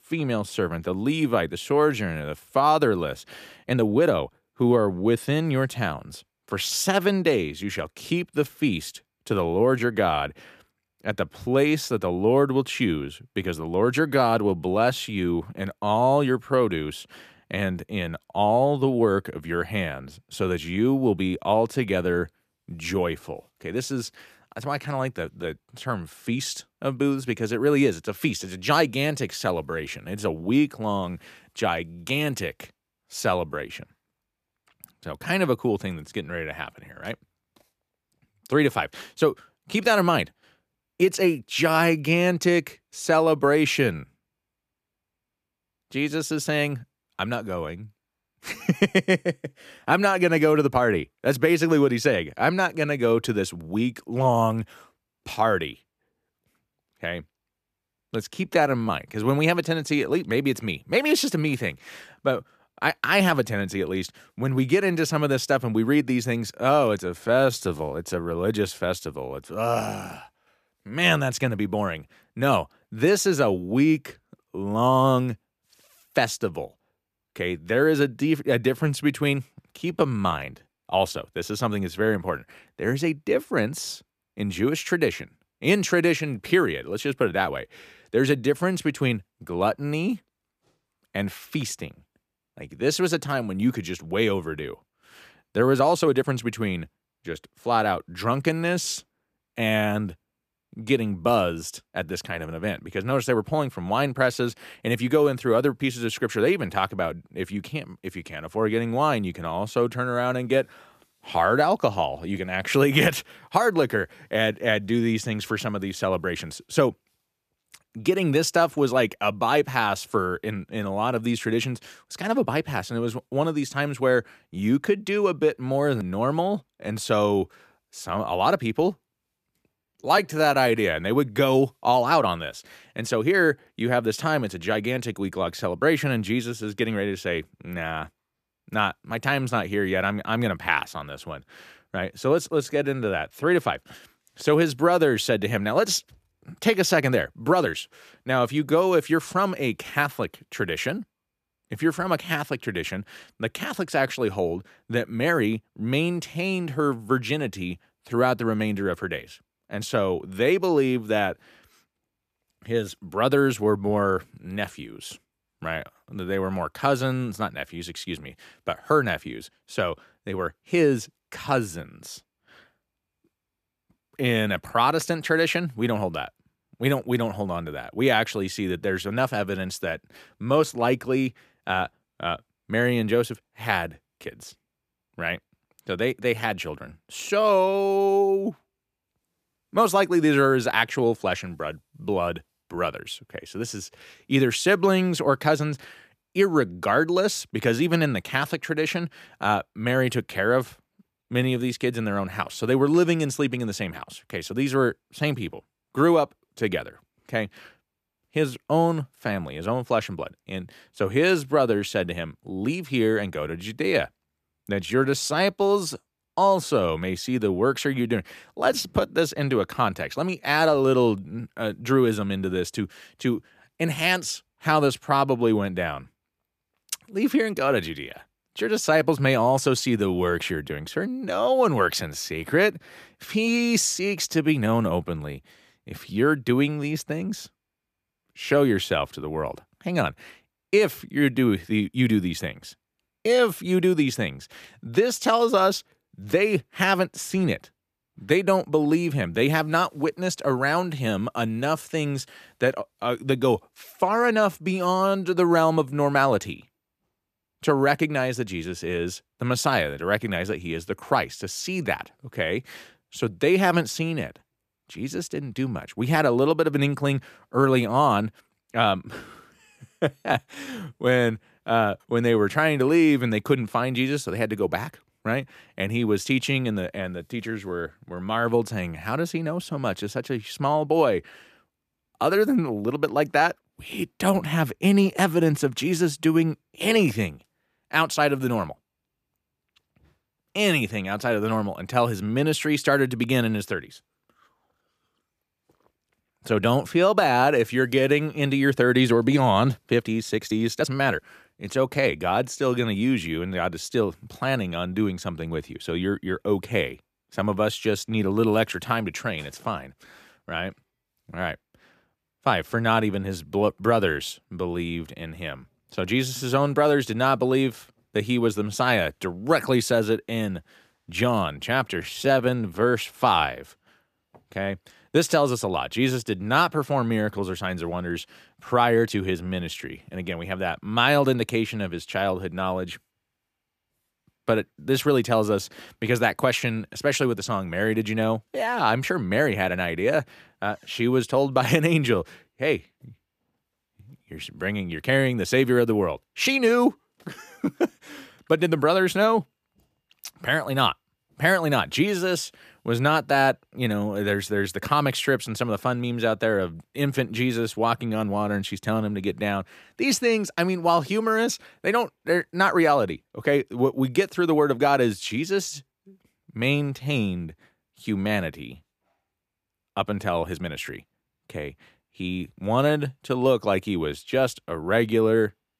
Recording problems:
uneven, jittery; strongly; from 3.5 s to 6:11

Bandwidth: 14.5 kHz